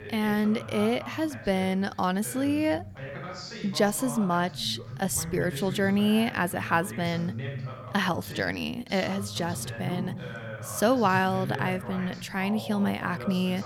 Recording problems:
voice in the background; noticeable; throughout; 10 dB below the speech

